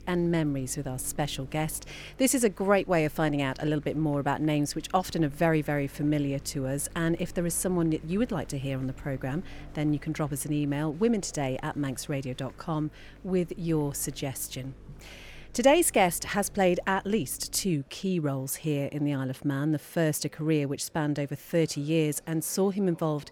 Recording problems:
electrical hum; faint; until 18 s; 50 Hz, 30 dB below the speech
murmuring crowd; faint; throughout; 30 dB below the speech

